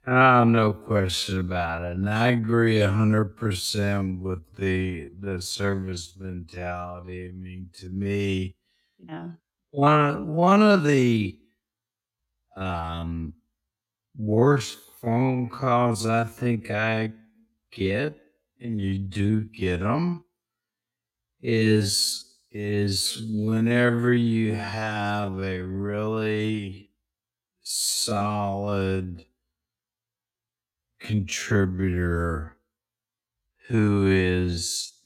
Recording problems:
wrong speed, natural pitch; too slow; 0.5 times normal speed

